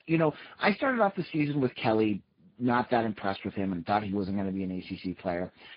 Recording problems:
garbled, watery; badly; nothing above 5 kHz

